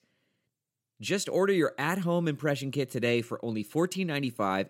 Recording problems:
none

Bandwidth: 16 kHz